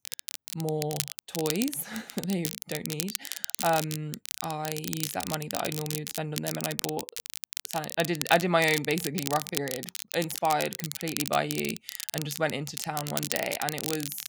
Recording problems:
crackle, like an old record; loud; 4 dB below the speech

